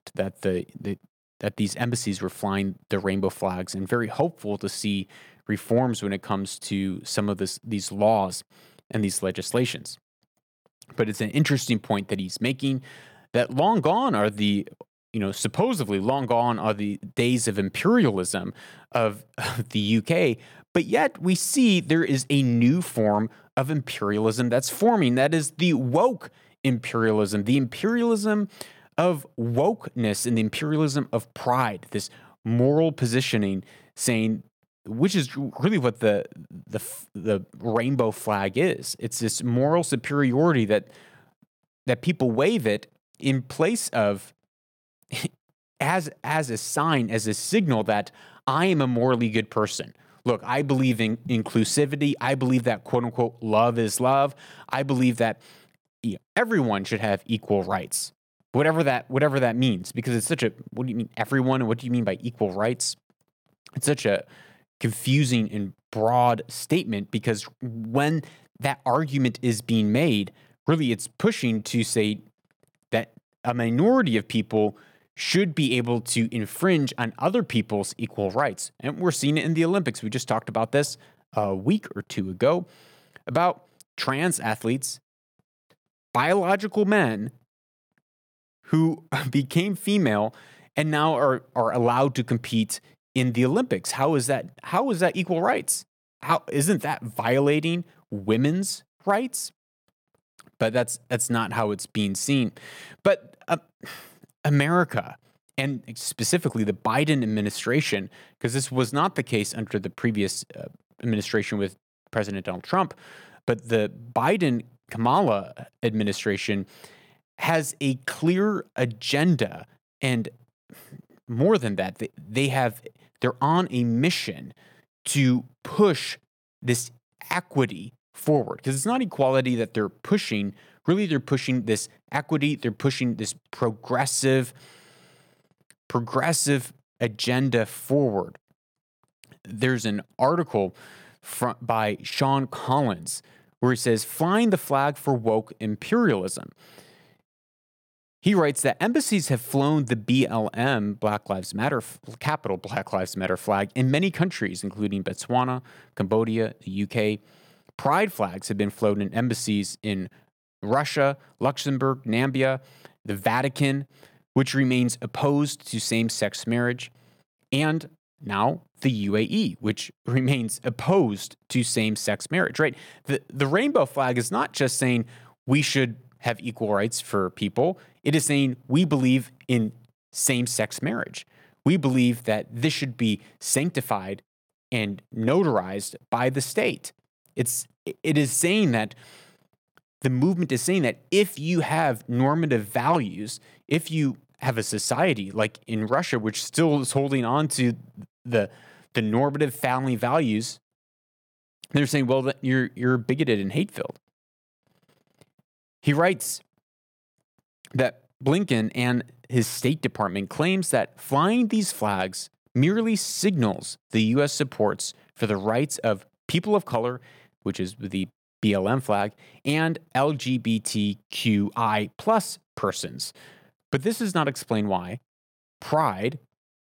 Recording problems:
none

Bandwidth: 18.5 kHz